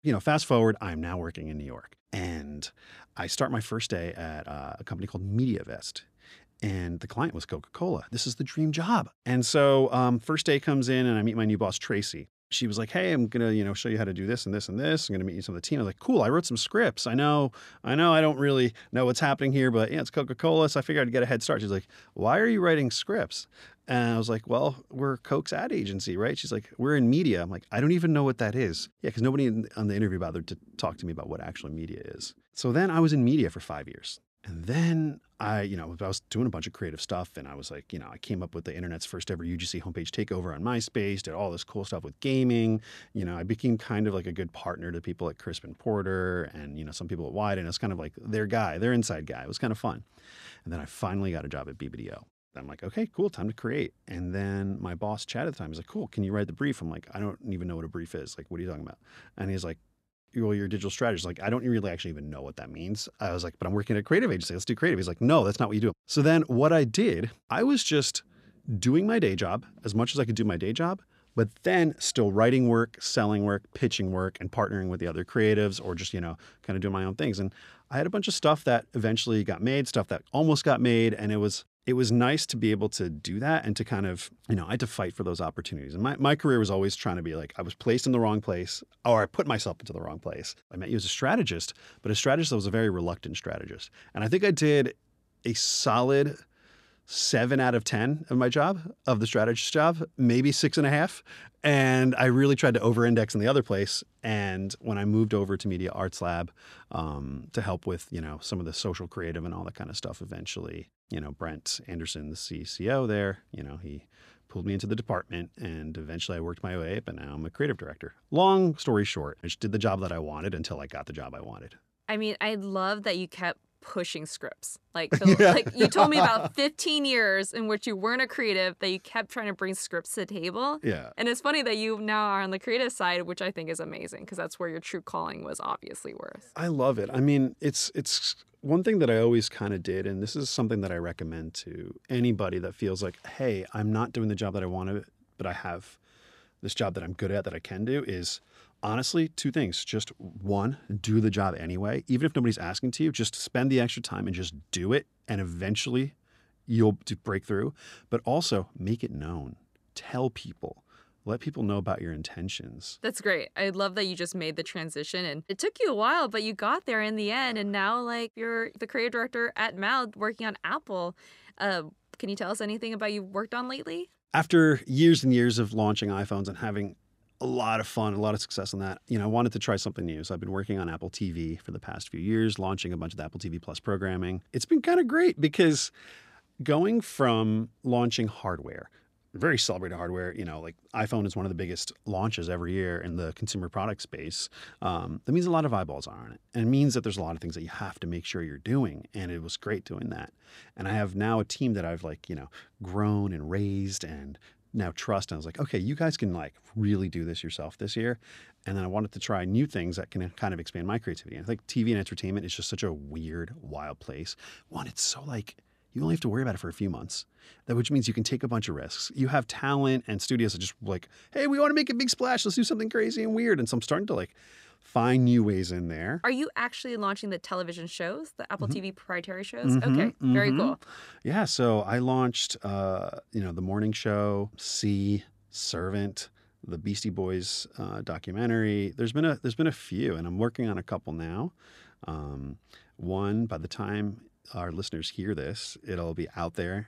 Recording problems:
none

